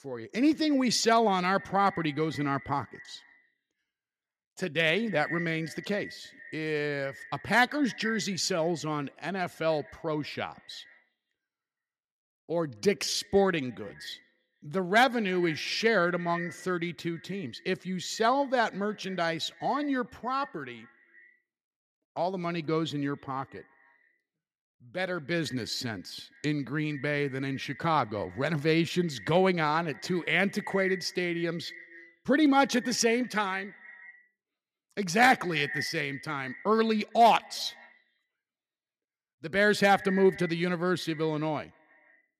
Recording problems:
echo of what is said; noticeable; throughout; 150 ms later, 15 dB below the speech

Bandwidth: 14.5 kHz